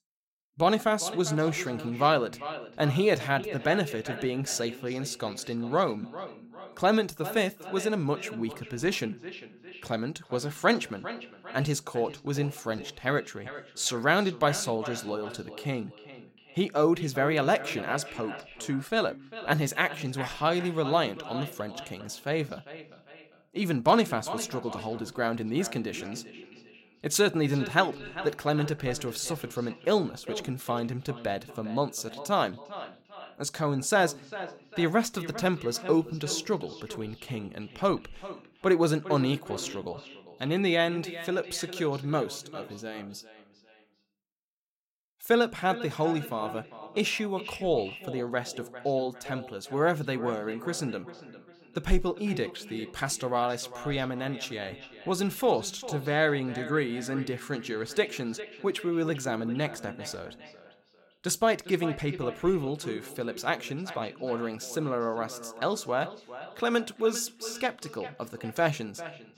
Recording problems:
echo of what is said; noticeable; throughout; 400 ms later, 15 dB below the speech

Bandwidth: 16 kHz